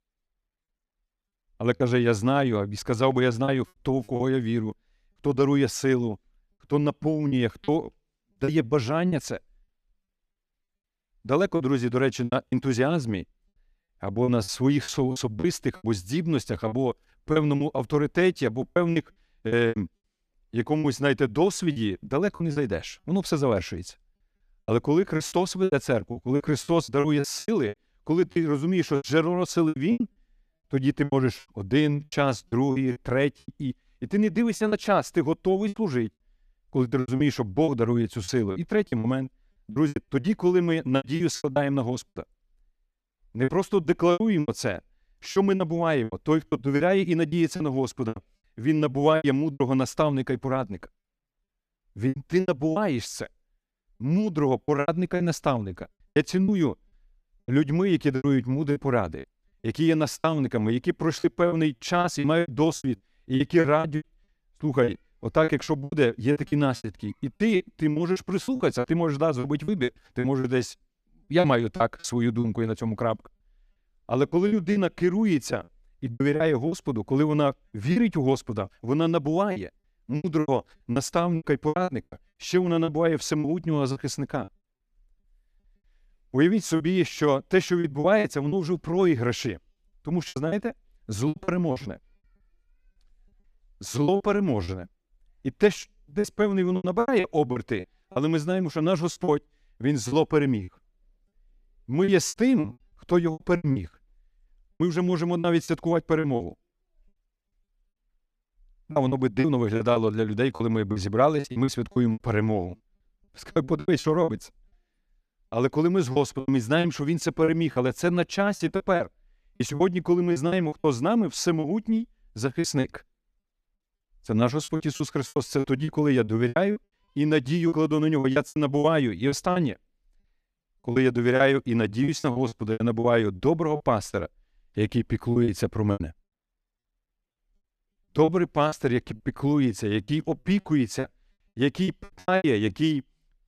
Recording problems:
choppy; very; 12% of the speech affected

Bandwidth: 14.5 kHz